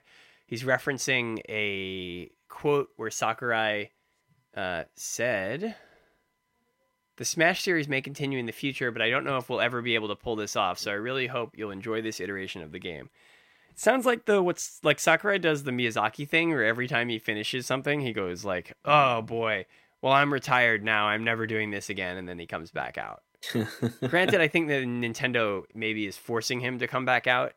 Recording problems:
none

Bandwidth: 16 kHz